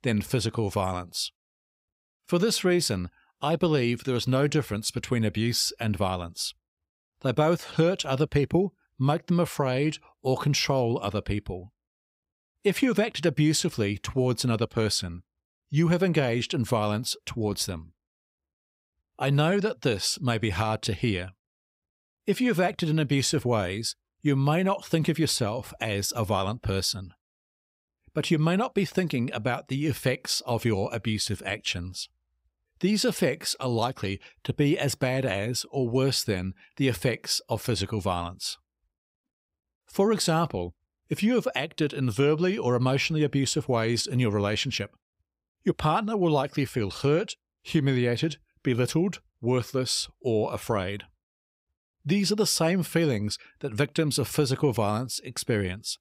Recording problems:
none

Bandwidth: 15.5 kHz